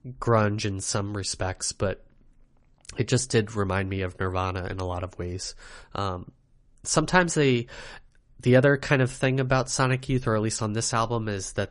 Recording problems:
garbled, watery; slightly; nothing above 10.5 kHz

